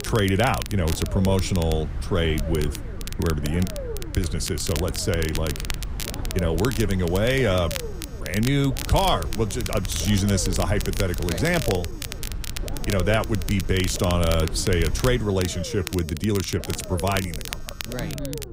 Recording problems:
wind noise on the microphone; occasional gusts; until 15 s; 20 dB below the speech
low rumble; noticeable; throughout; 15 dB below the speech
crackle, like an old record; noticeable; 10 dB below the speech
alarms or sirens; faint; throughout; 25 dB below the speech

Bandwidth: 15.5 kHz